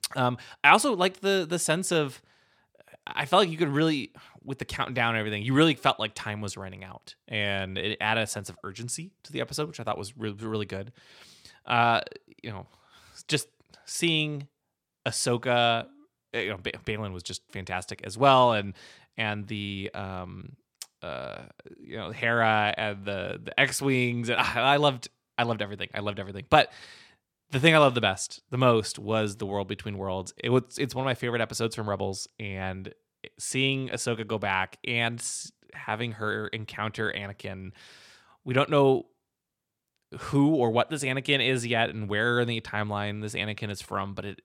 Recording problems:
none

